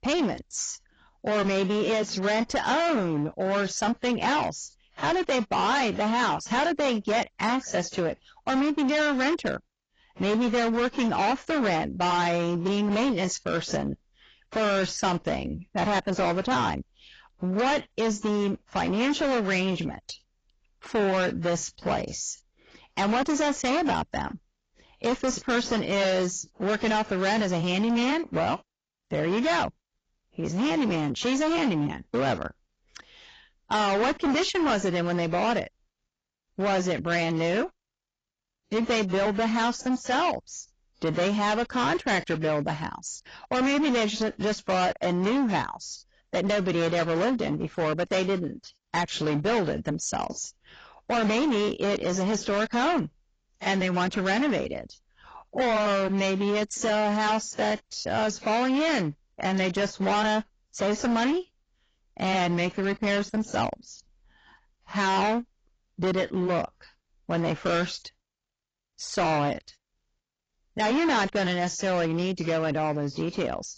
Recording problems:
distortion; heavy; 19% of the sound clipped
garbled, watery; badly; nothing above 7.5 kHz

